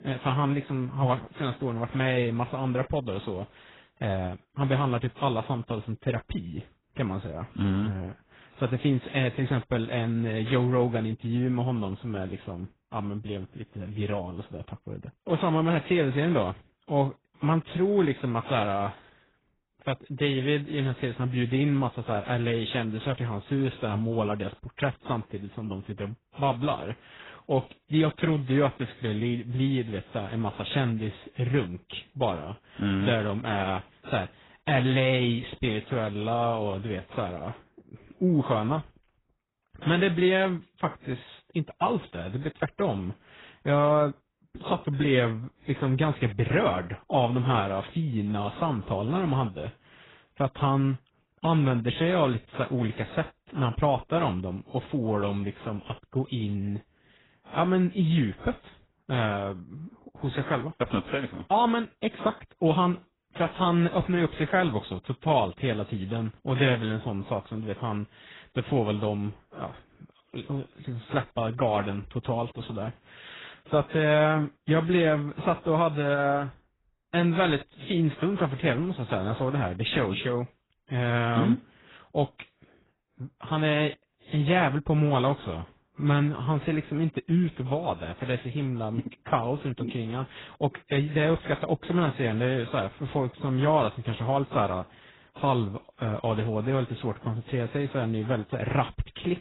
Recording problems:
garbled, watery; badly; nothing above 4 kHz

